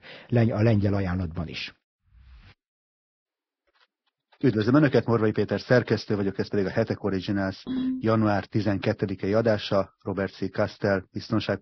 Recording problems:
garbled, watery; badly; nothing above 5.5 kHz
phone ringing; noticeable; at 7.5 s; peak 4 dB below the speech

